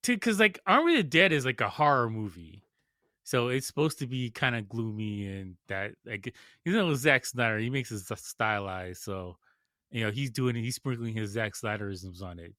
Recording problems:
none

